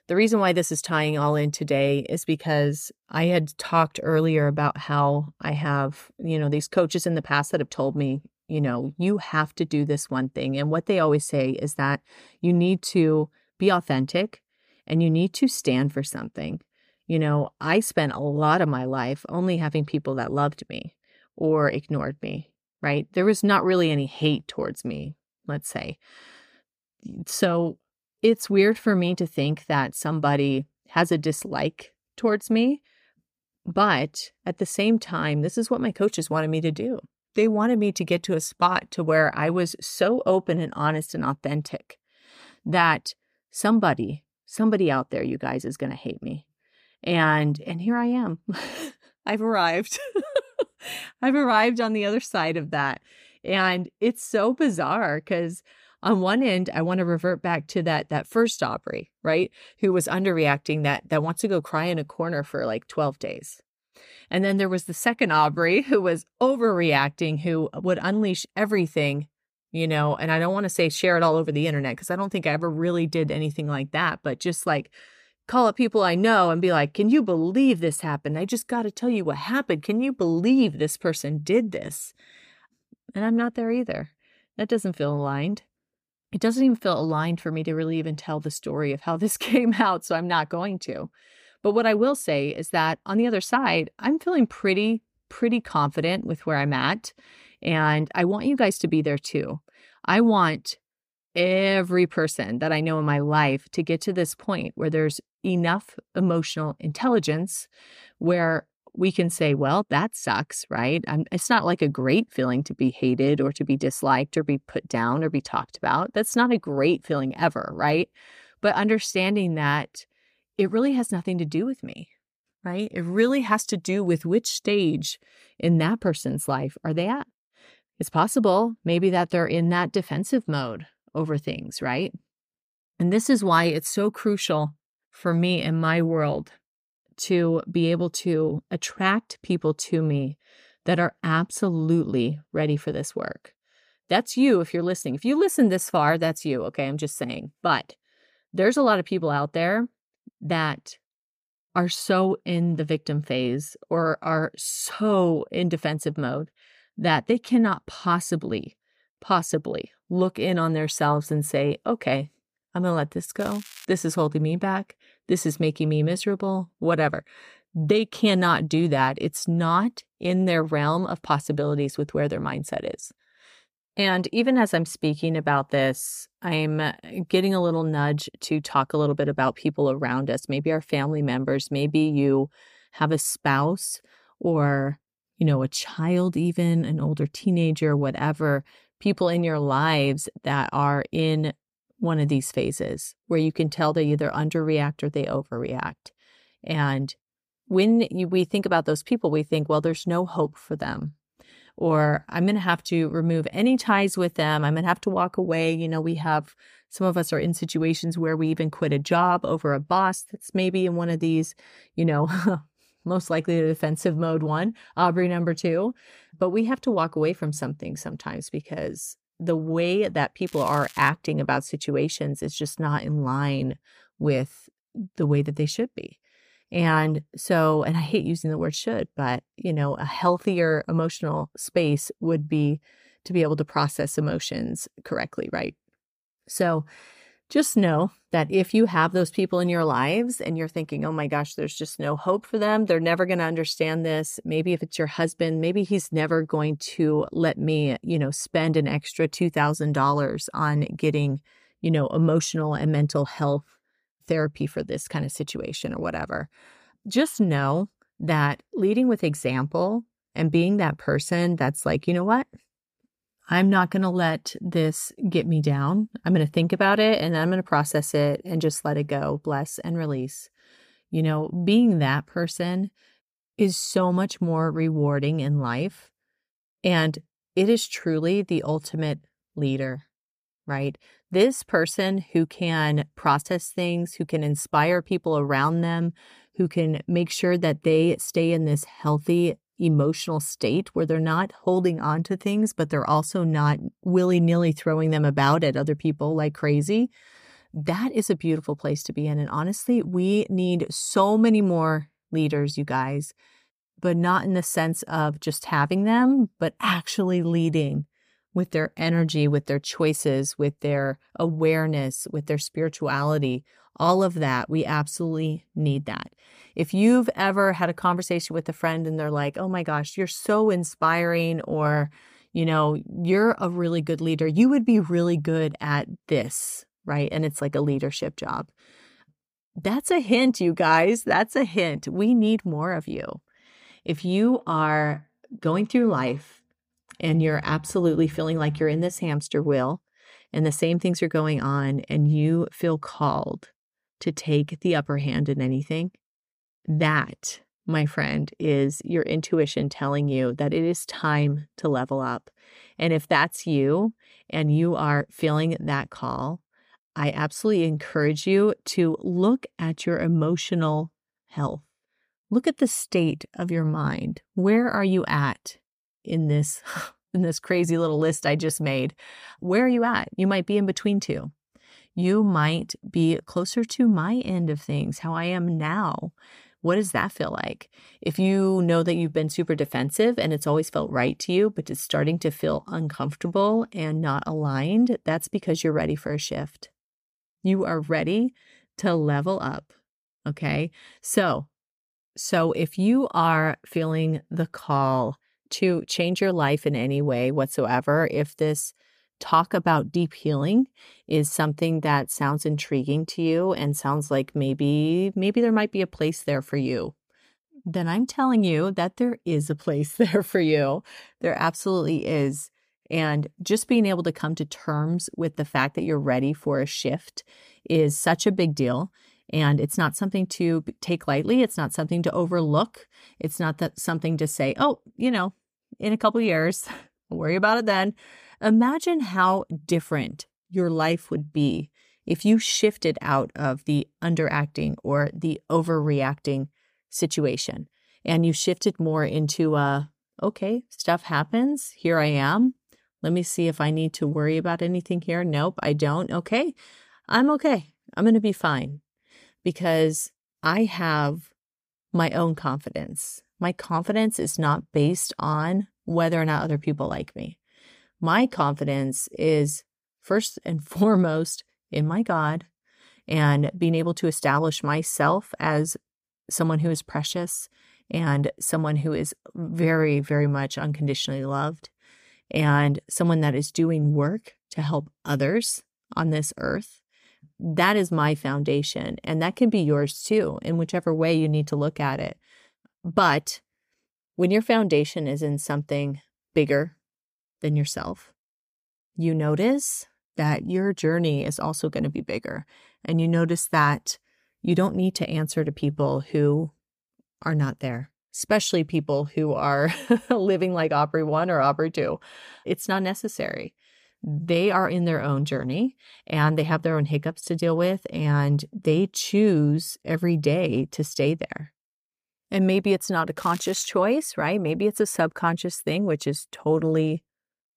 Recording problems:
crackling; noticeable; at 2:43, at 3:40 and at 8:33; 20 dB below the speech

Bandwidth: 15 kHz